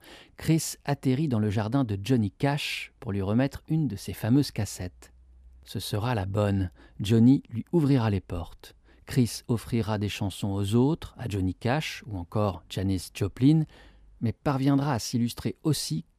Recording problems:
none

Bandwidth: 14.5 kHz